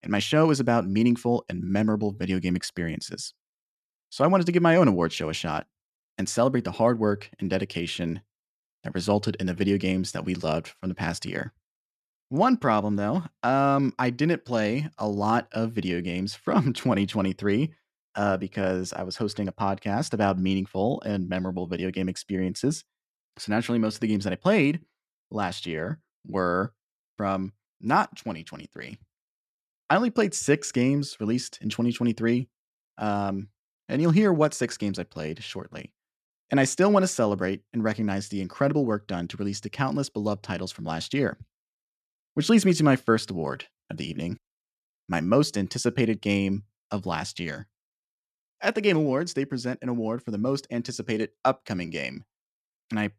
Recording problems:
none

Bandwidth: 13.5 kHz